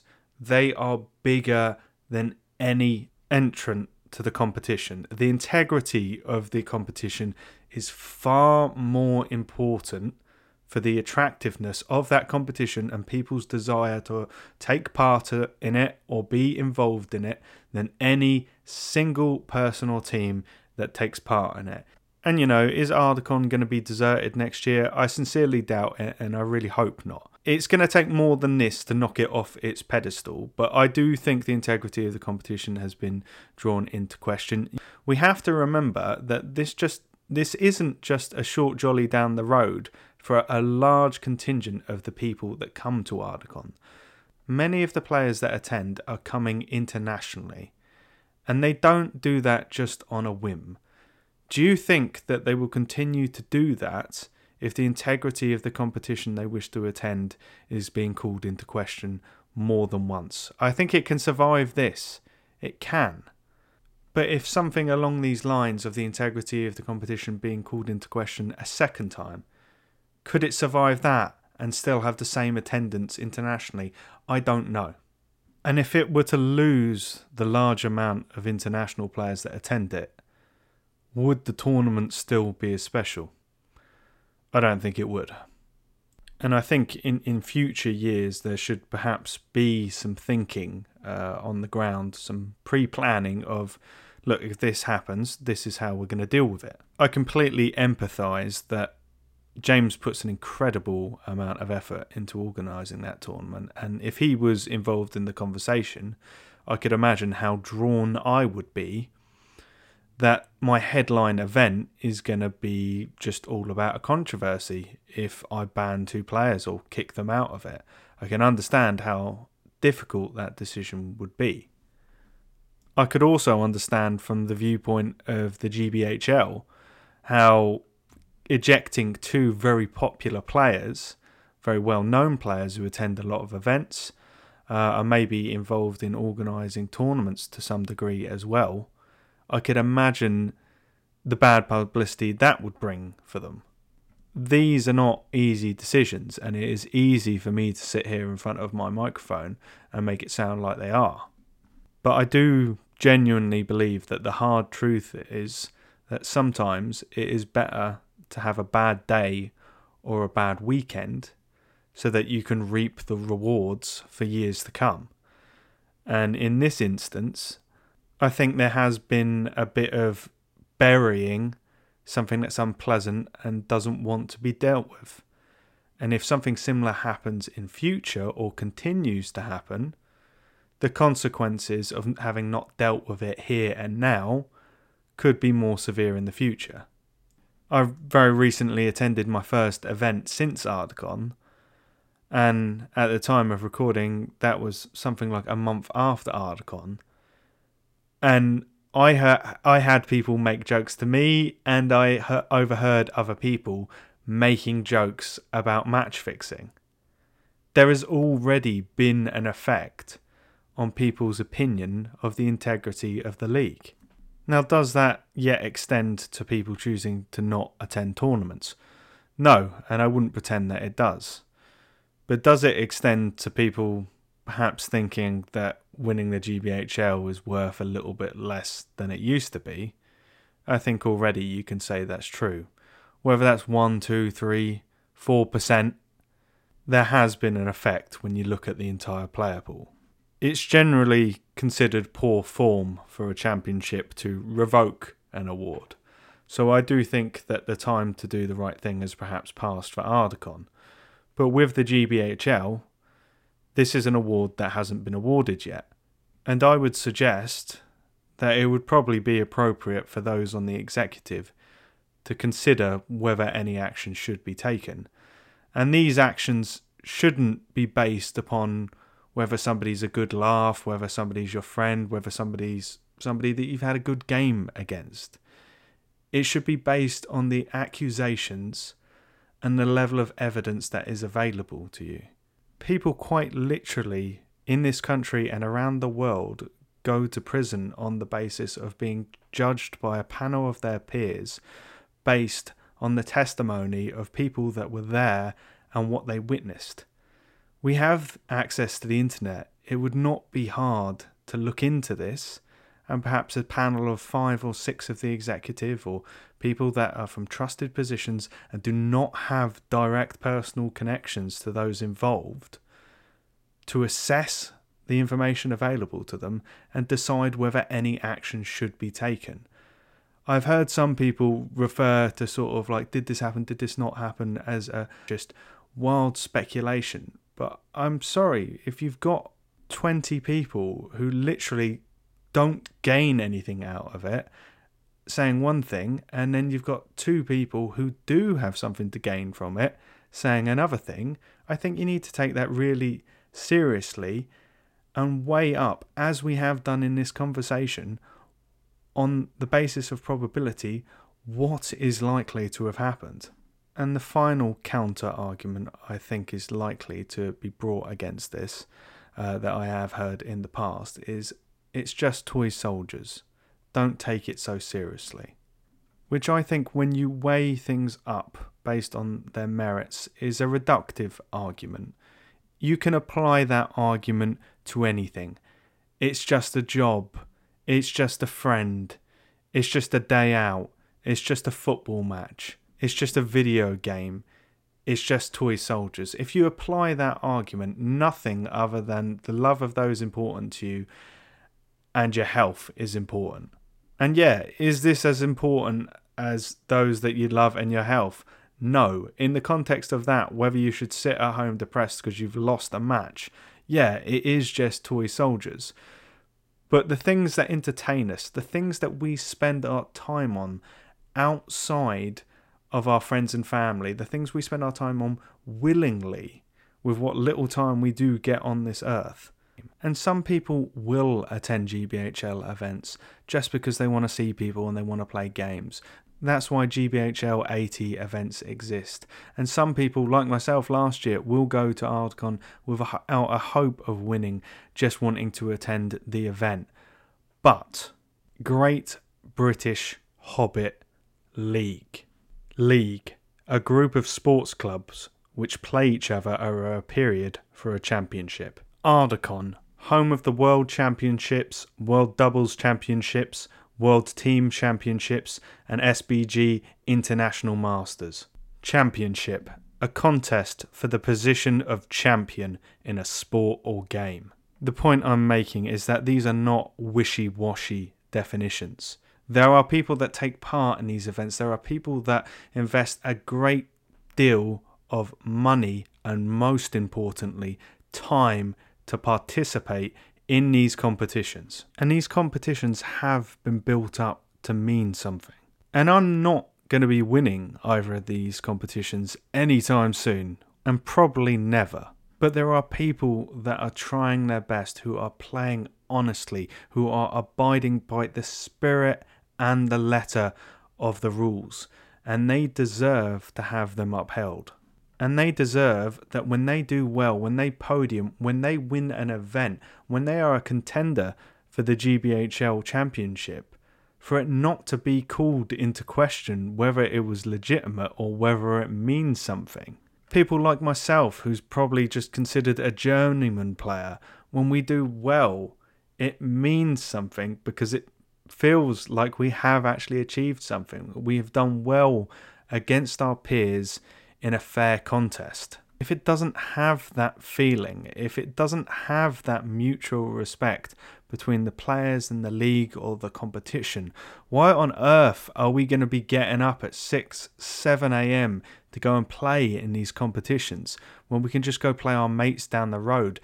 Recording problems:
none

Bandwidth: 16 kHz